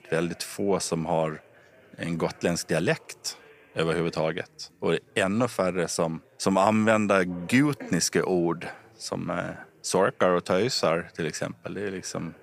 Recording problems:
background chatter; faint; throughout; 4 voices, 30 dB below the speech

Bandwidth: 15 kHz